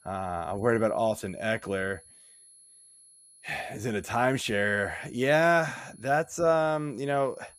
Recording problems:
high-pitched whine; faint; throughout; 10.5 kHz, 25 dB below the speech

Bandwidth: 14.5 kHz